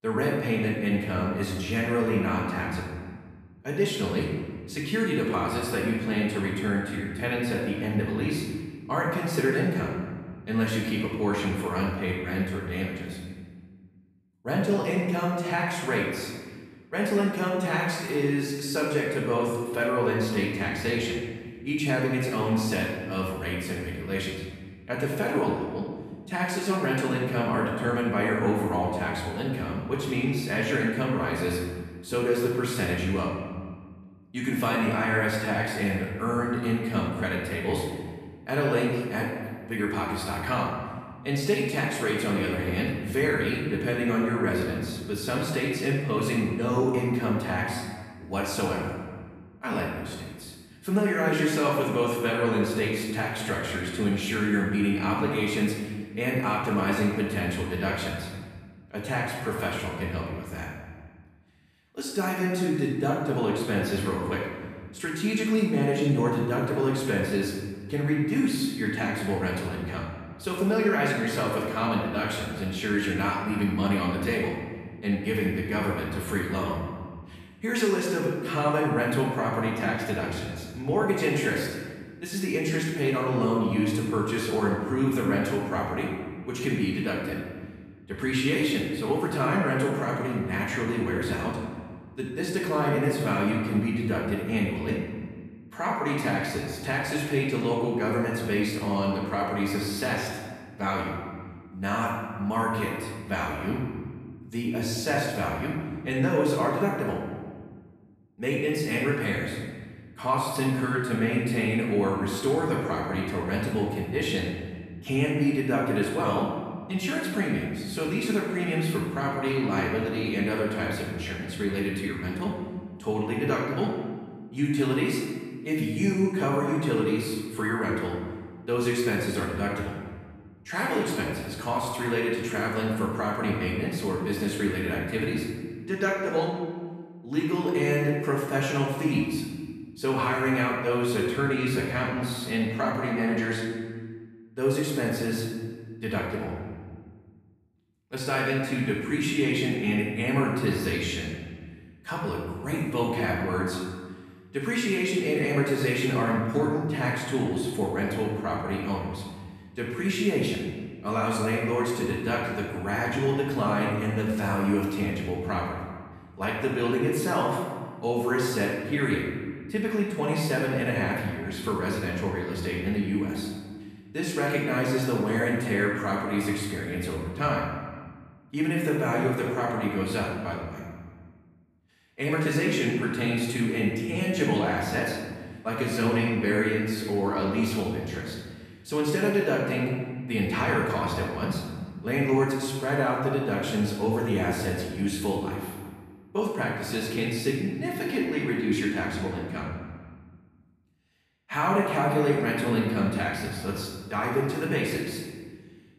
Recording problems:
off-mic speech; far
room echo; noticeable; dies away in 1.4 s

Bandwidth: 14.5 kHz